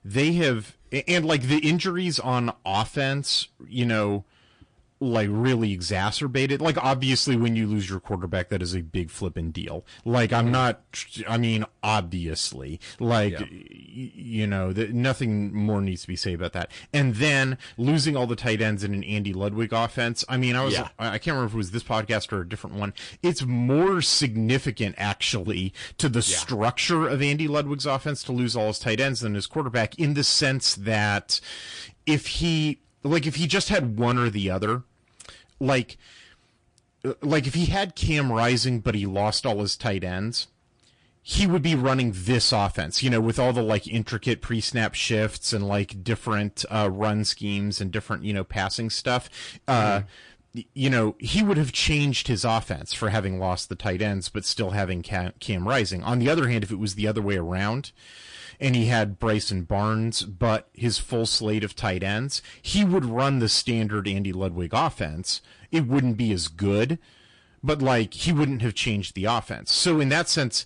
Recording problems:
distortion; slight; 10 dB below the speech
garbled, watery; slightly

